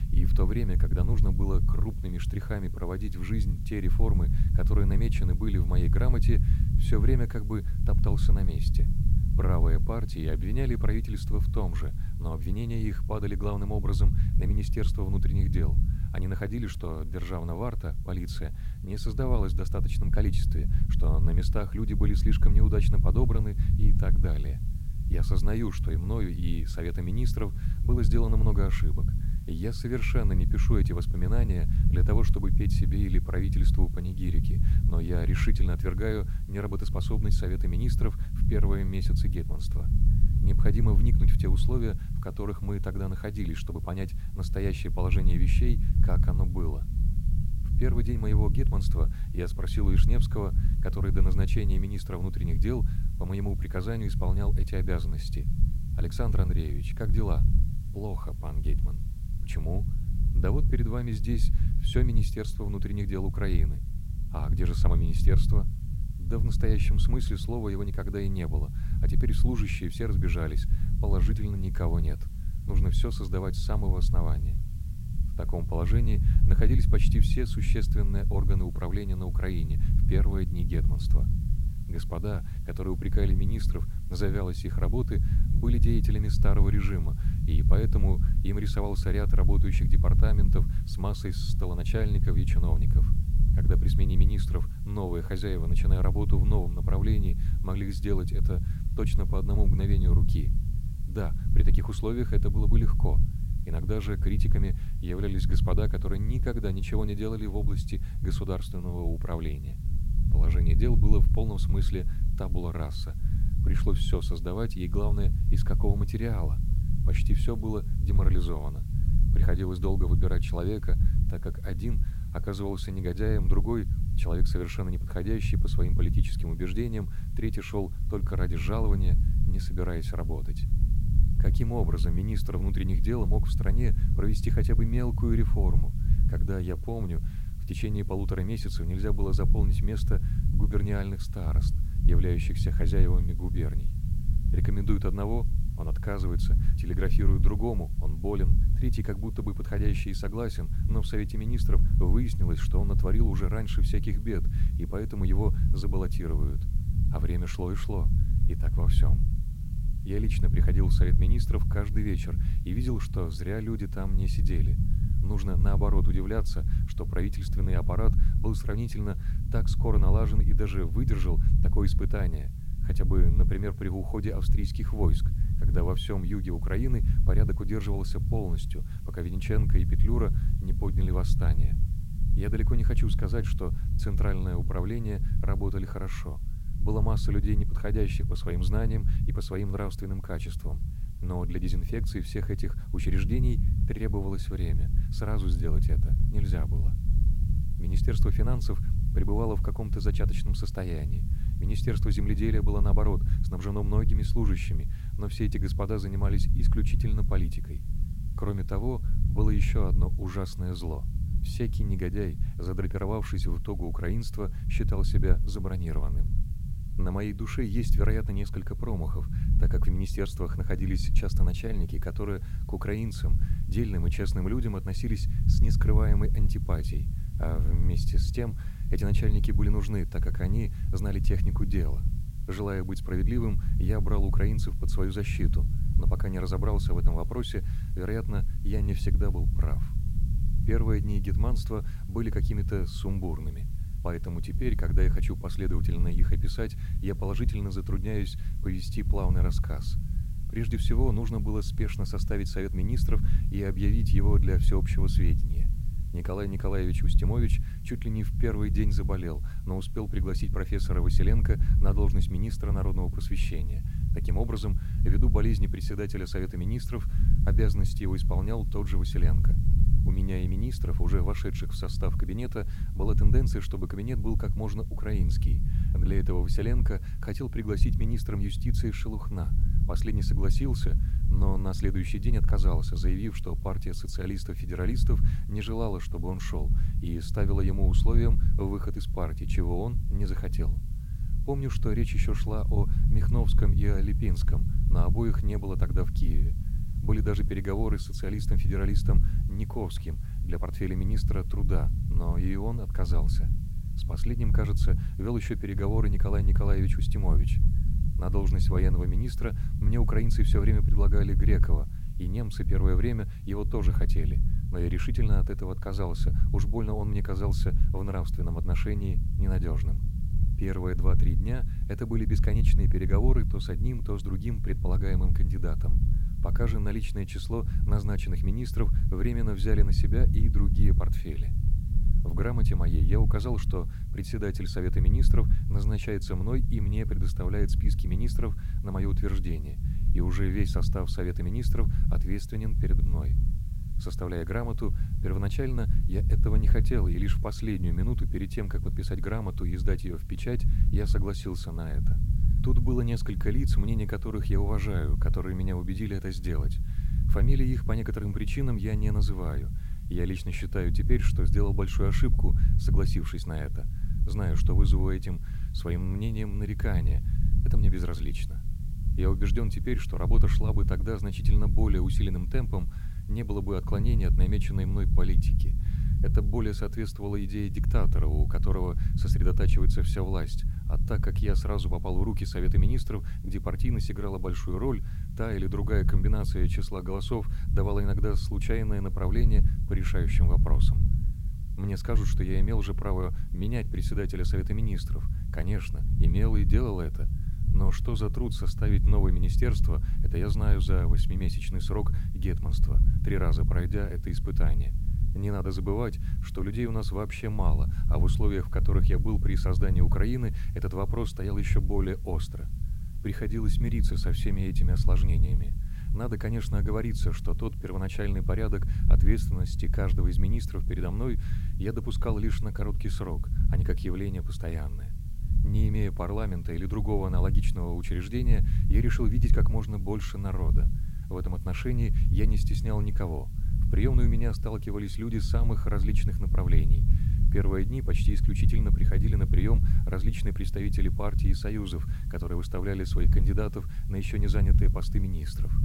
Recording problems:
low rumble; loud; throughout; 7 dB below the speech
hiss; faint; throughout; 25 dB below the speech

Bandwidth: 16 kHz